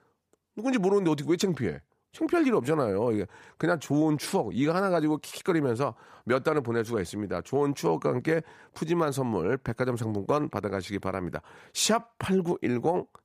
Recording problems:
none

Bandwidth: 15 kHz